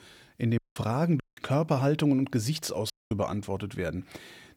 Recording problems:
audio cutting out; at 0.5 s, at 1 s and at 3 s

